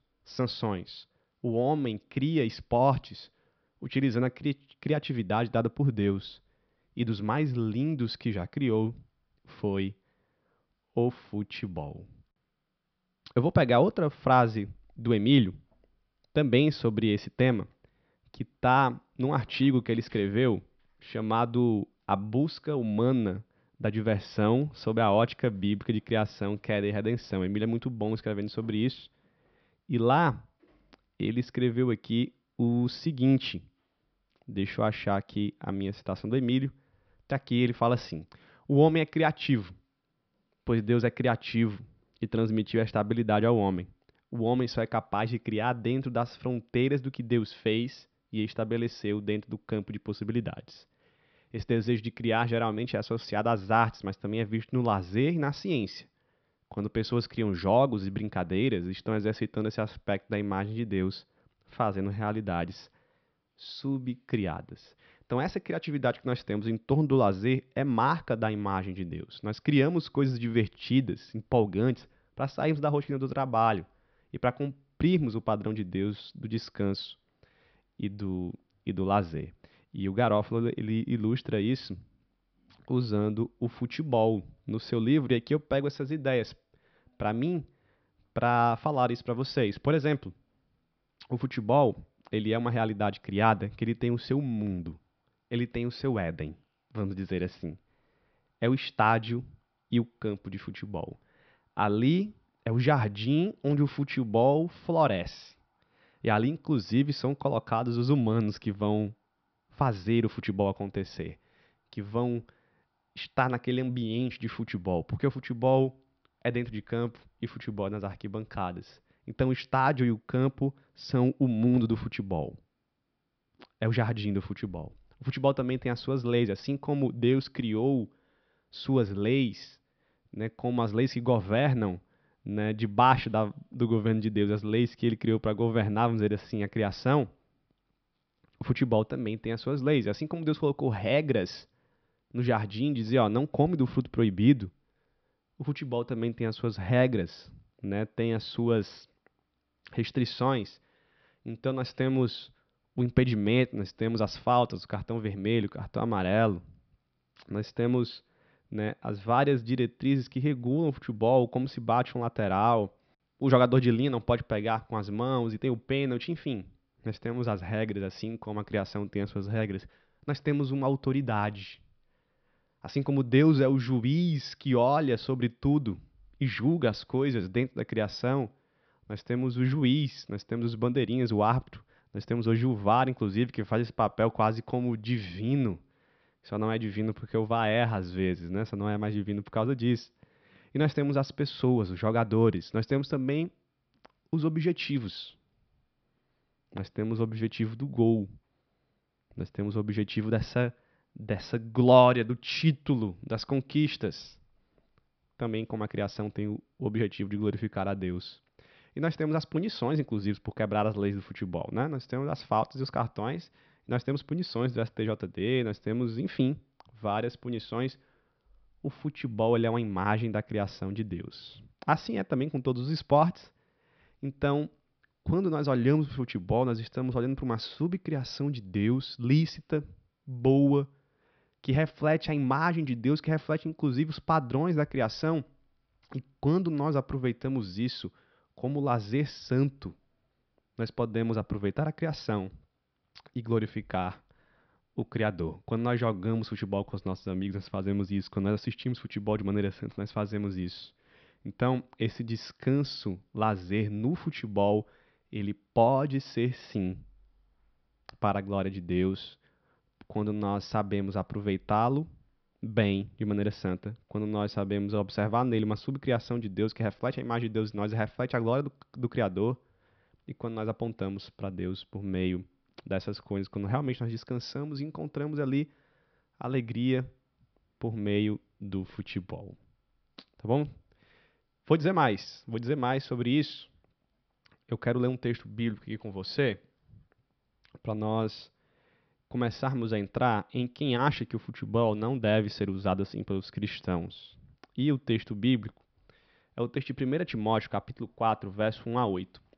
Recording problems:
high frequencies cut off; noticeable; nothing above 5.5 kHz

